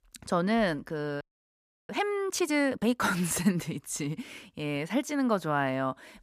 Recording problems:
audio freezing; at 1 s for 0.5 s

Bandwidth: 14.5 kHz